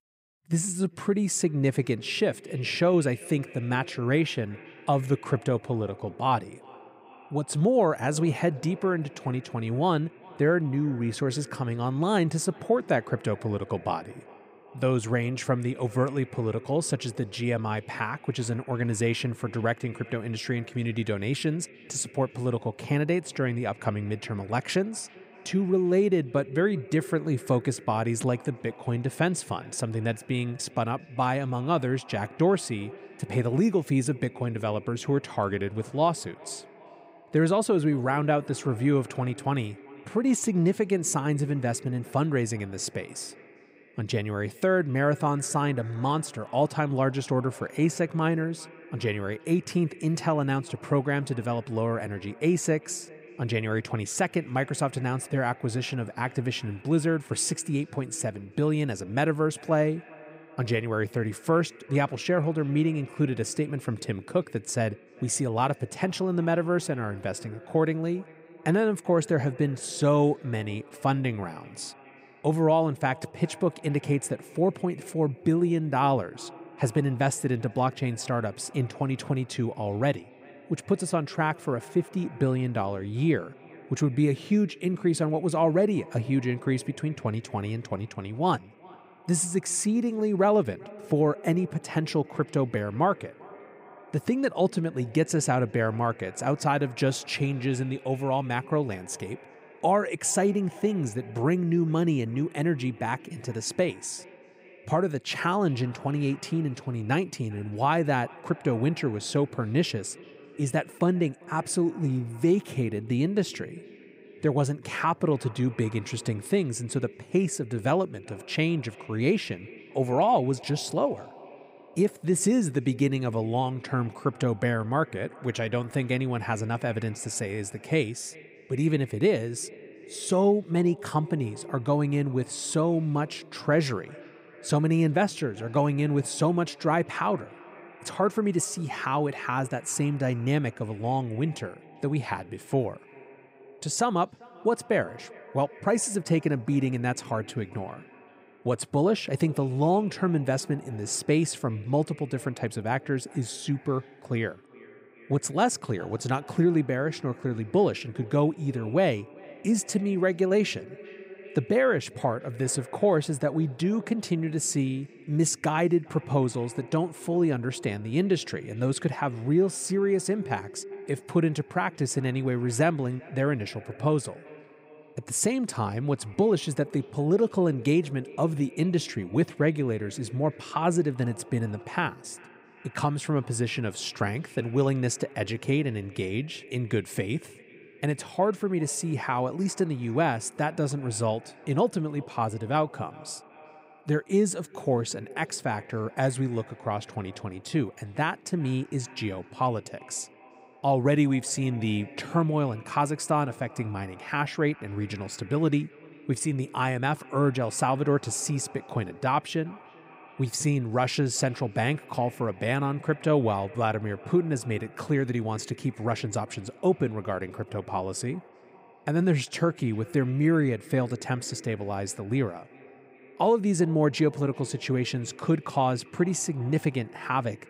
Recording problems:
echo of what is said; faint; throughout; 390 ms later, 20 dB below the speech

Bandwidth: 15.5 kHz